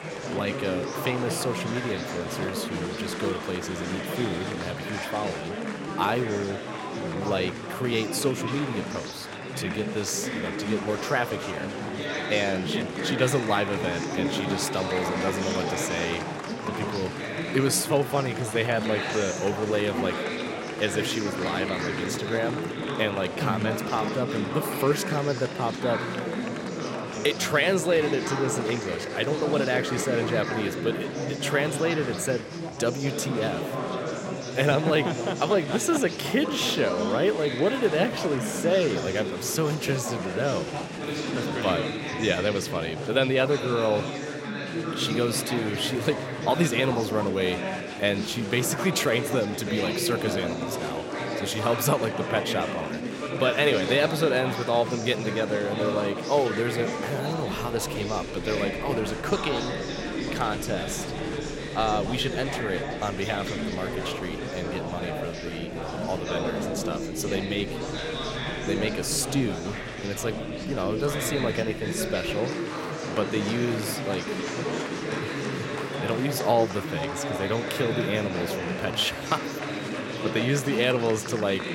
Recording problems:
chatter from many people; loud; throughout; 3 dB below the speech

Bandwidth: 16 kHz